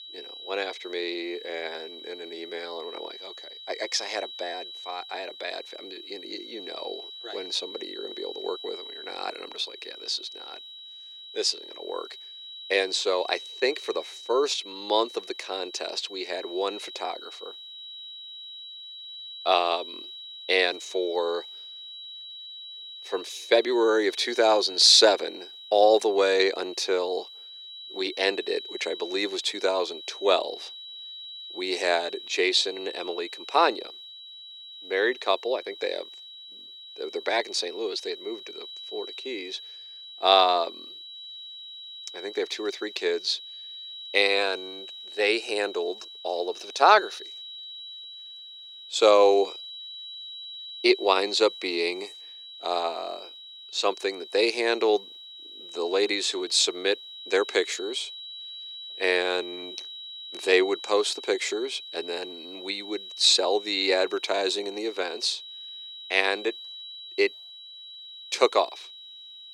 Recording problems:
thin; very; fading below 350 Hz
high-pitched whine; noticeable; throughout; 4 kHz, 15 dB below the speech

